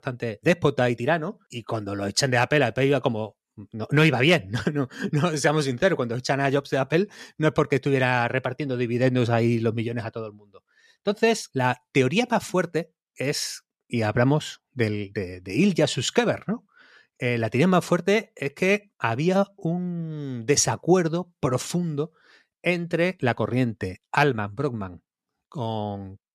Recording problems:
none

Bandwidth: 14 kHz